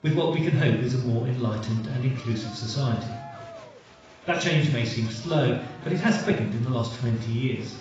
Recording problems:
off-mic speech; far
garbled, watery; badly; nothing above 7.5 kHz
room echo; noticeable; dies away in 0.6 s
crowd noise; noticeable; throughout; 20 dB below the speech
uneven, jittery; strongly; from 1 to 7.5 s

